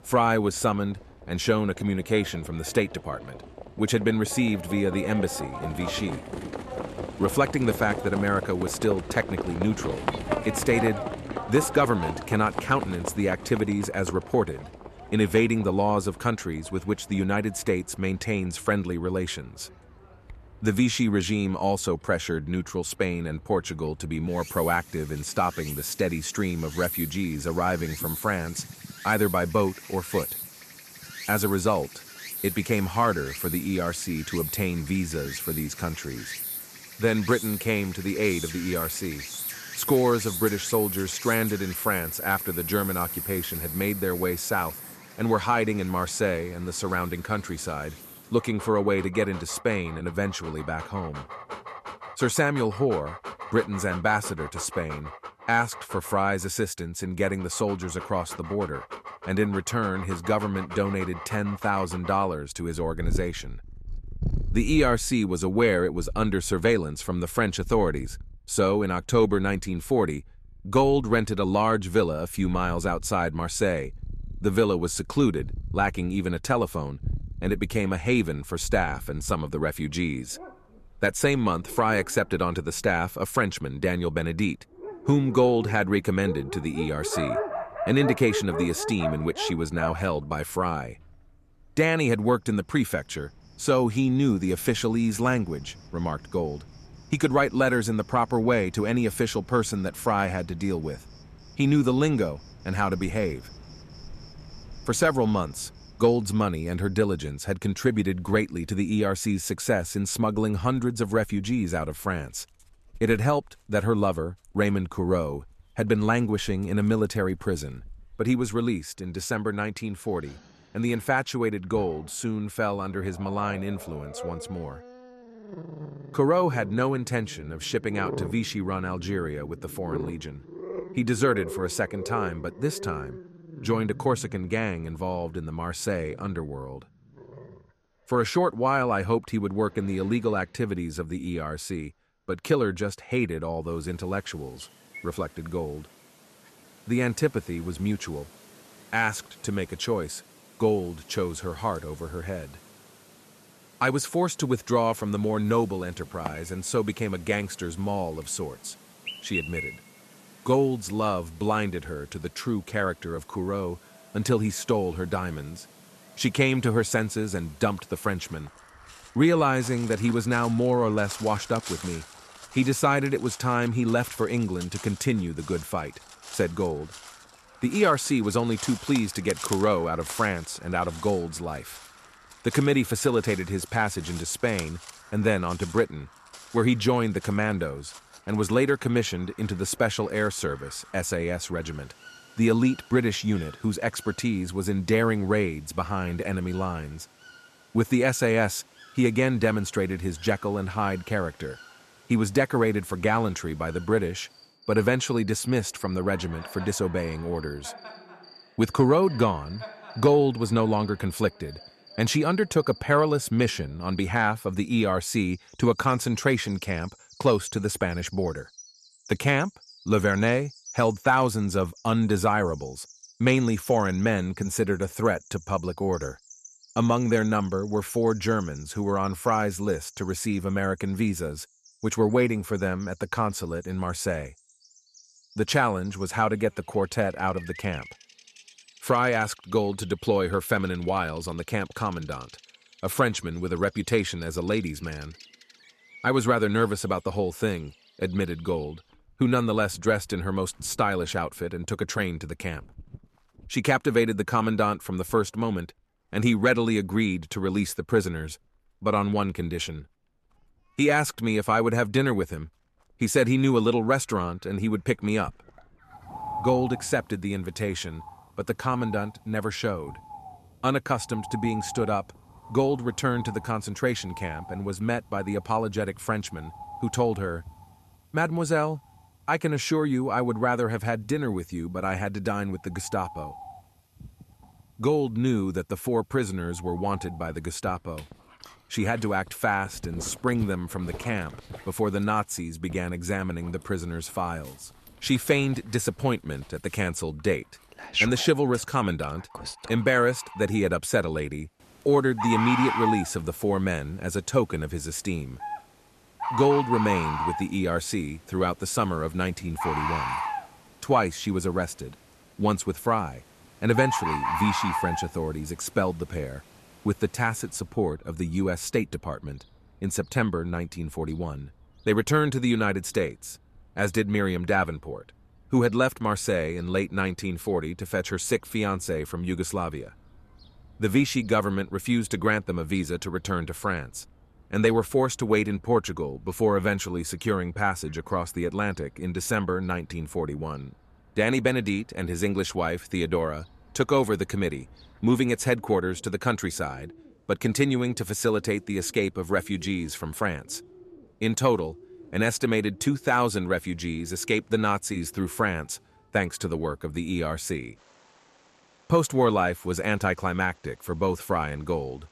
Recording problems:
animal sounds; noticeable; throughout; 10 dB below the speech

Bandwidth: 13.5 kHz